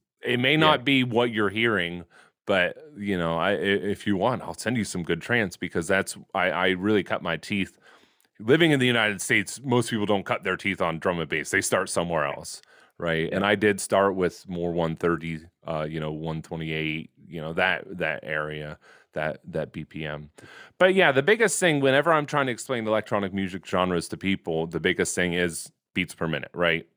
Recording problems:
none

